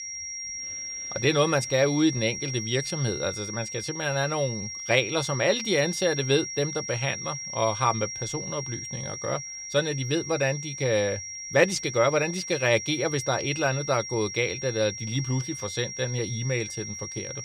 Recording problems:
high-pitched whine; loud; throughout; 5.5 kHz, 7 dB below the speech

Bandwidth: 15 kHz